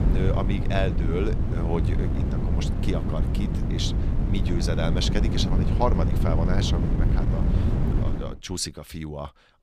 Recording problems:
wind noise on the microphone; heavy; until 8 s; 4 dB below the speech

